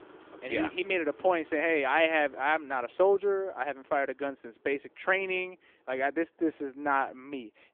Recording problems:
phone-call audio
traffic noise; faint; throughout; 25 dB below the speech

